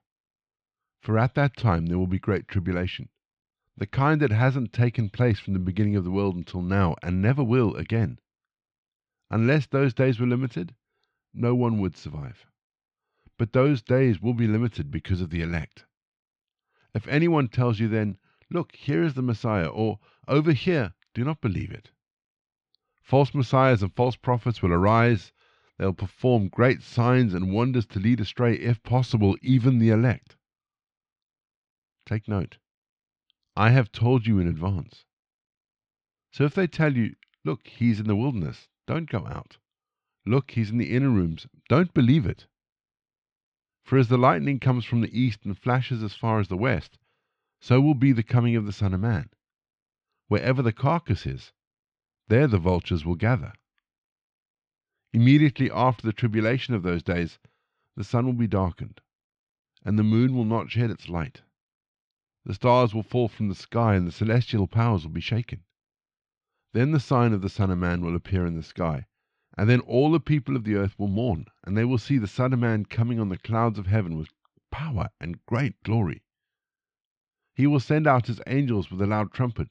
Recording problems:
muffled; slightly; fading above 3.5 kHz

